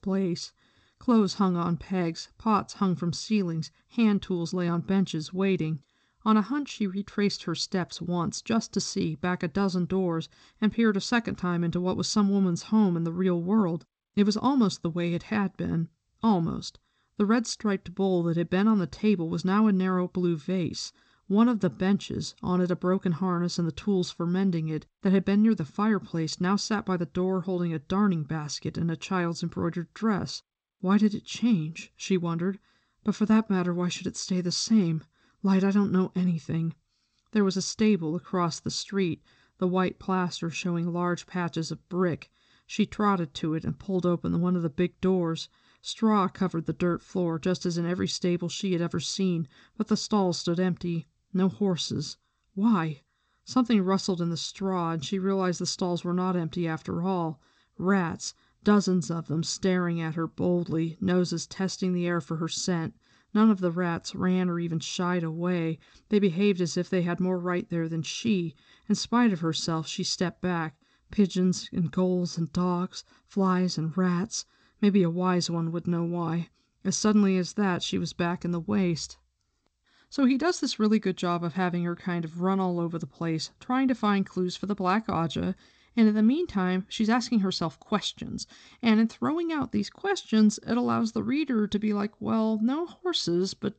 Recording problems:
garbled, watery; slightly; nothing above 8 kHz

